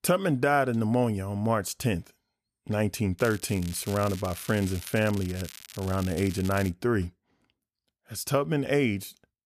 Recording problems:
crackling; noticeable; from 3 to 6.5 s; 15 dB below the speech

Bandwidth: 14.5 kHz